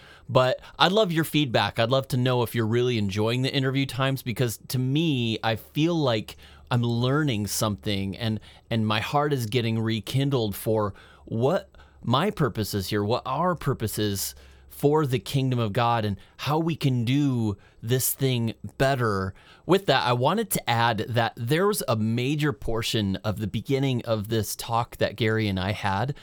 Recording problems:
none

